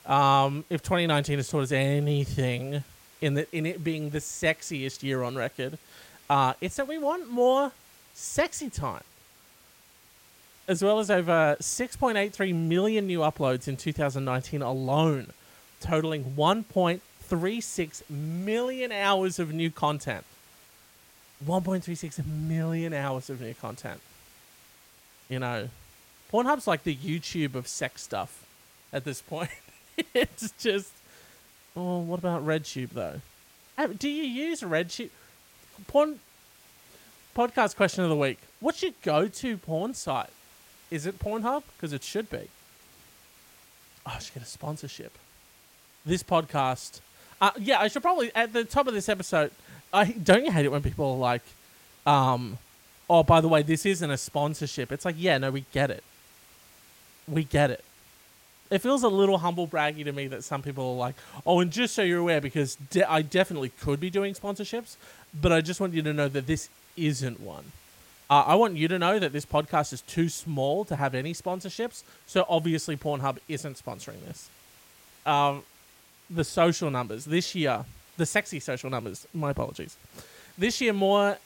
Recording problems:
hiss; faint; throughout; 25 dB below the speech

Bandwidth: 16.5 kHz